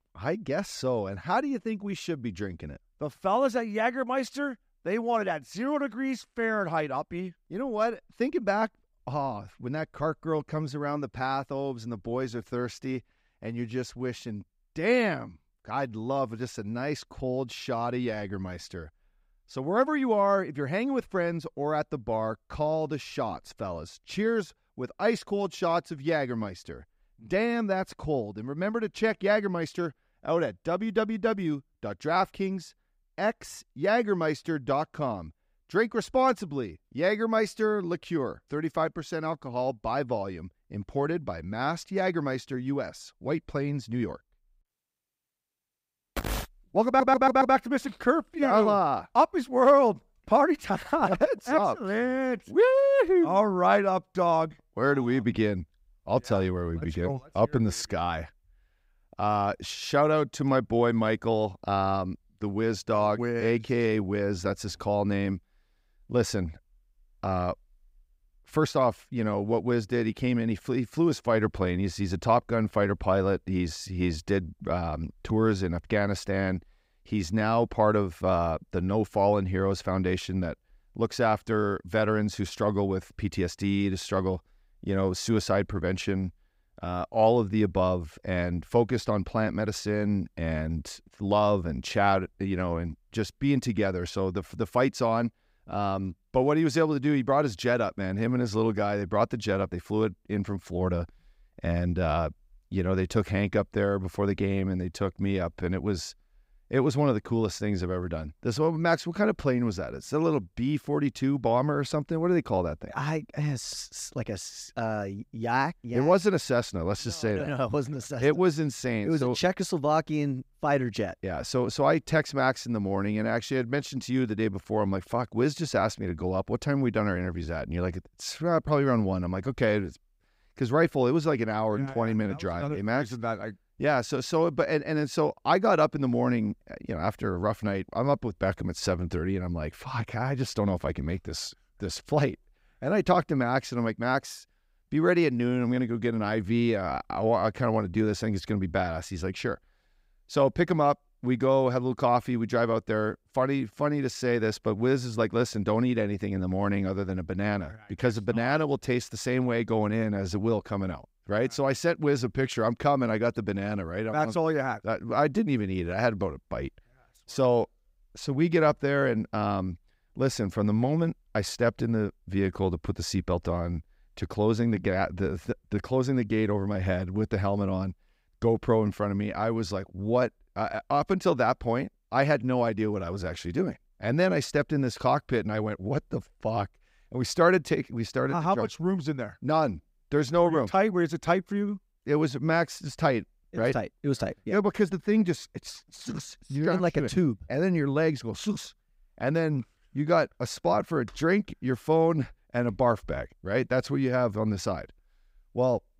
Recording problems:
audio stuttering; at 47 s

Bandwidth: 15.5 kHz